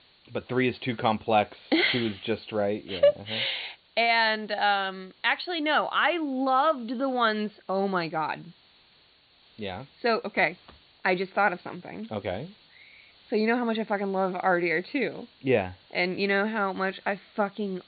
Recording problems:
high frequencies cut off; severe; nothing above 4.5 kHz
hiss; faint; throughout; 30 dB below the speech

